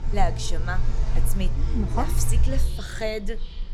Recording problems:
animal sounds; very loud; throughout; 4 dB above the speech

